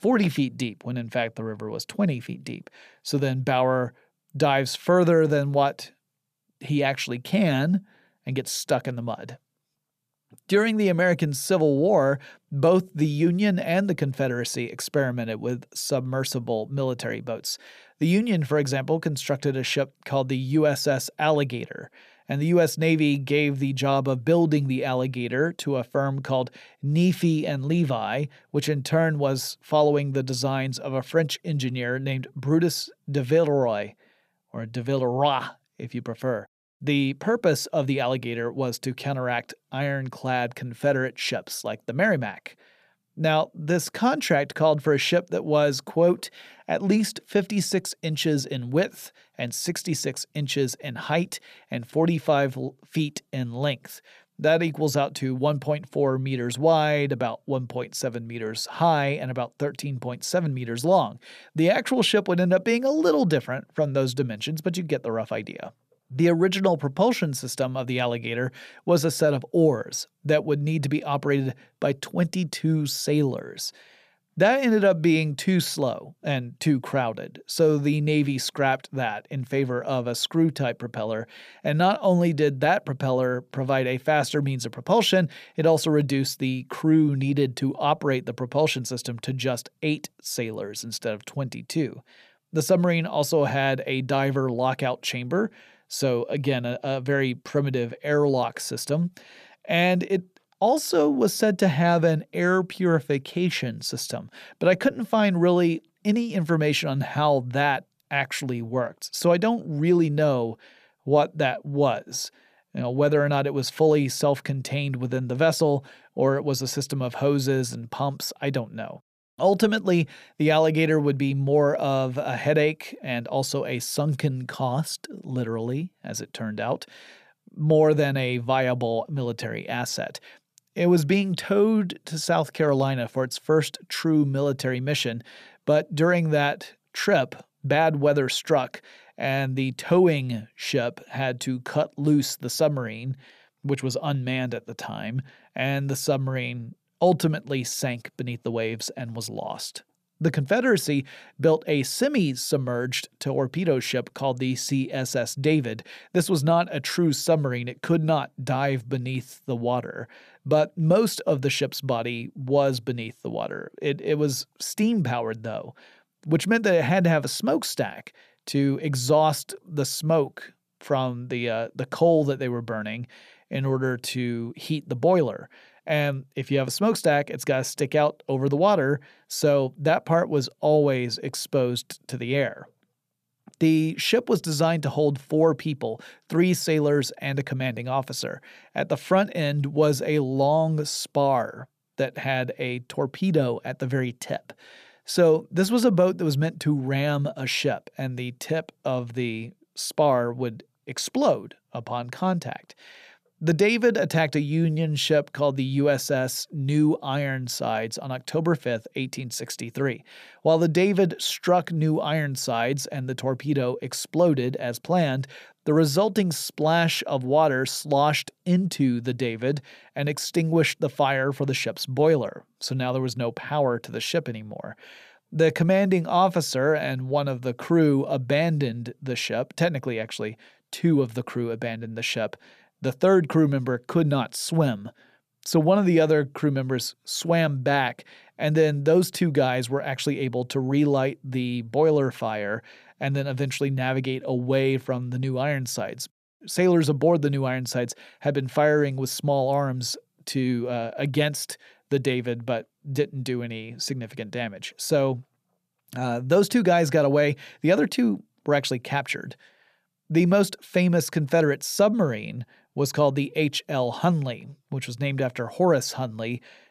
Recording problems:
none

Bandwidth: 14.5 kHz